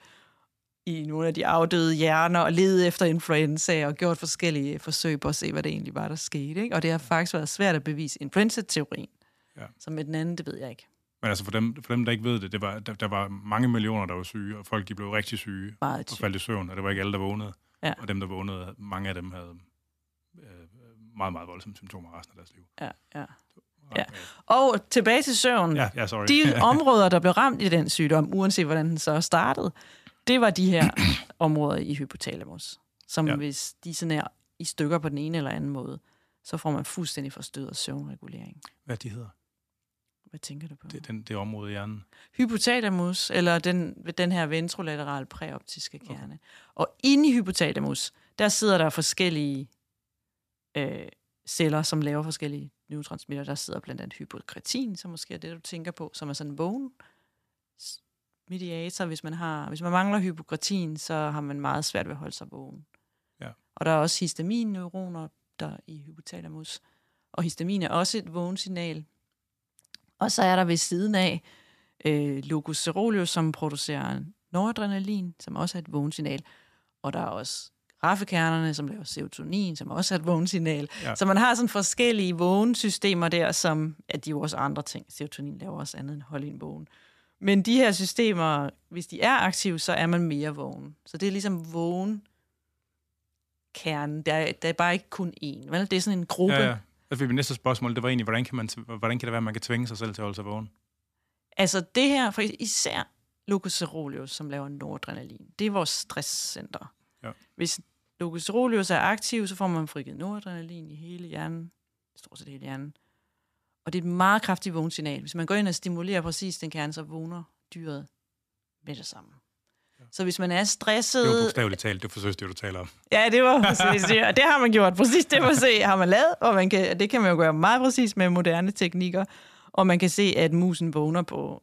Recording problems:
none

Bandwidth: 14.5 kHz